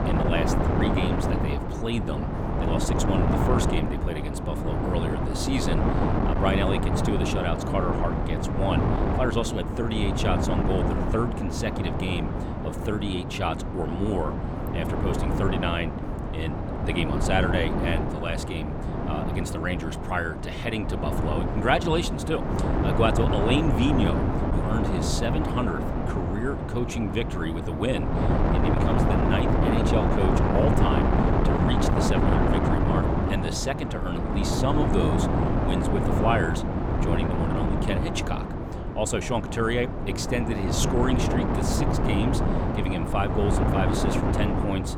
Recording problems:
wind noise on the microphone; heavy; as loud as the speech

